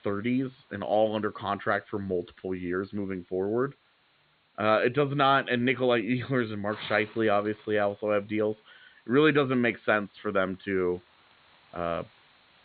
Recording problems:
high frequencies cut off; severe; nothing above 4 kHz
hiss; faint; throughout; 30 dB below the speech

